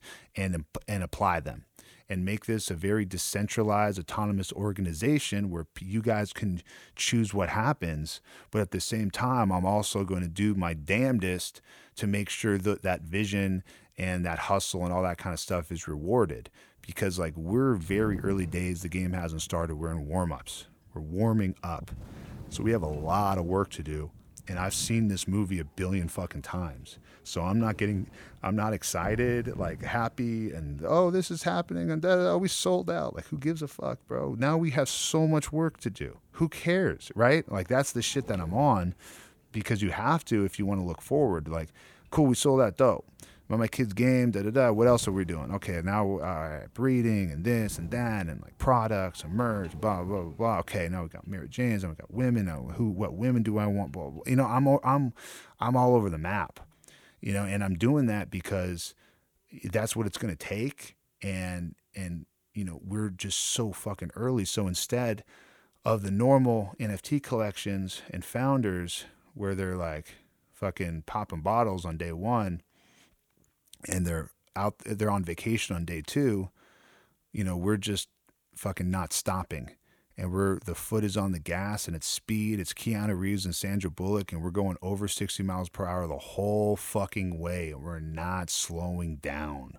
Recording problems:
wind noise on the microphone; occasional gusts; from 17 to 55 s; 25 dB below the speech

